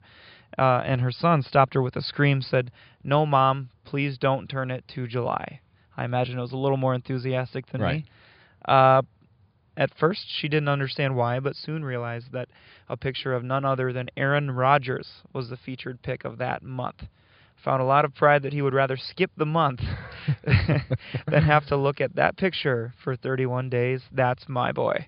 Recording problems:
high frequencies cut off; severe; nothing above 5 kHz

